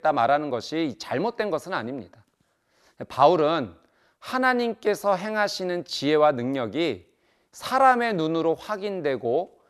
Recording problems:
none

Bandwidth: 13.5 kHz